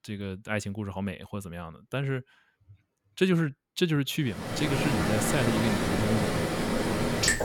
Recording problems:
rain or running water; very loud; from 4.5 s on; 2 dB above the speech

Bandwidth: 17.5 kHz